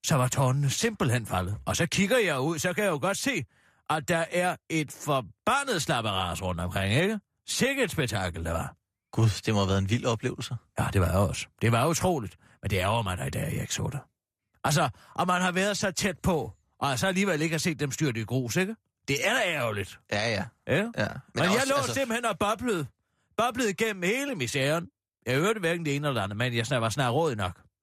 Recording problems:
none

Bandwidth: 14.5 kHz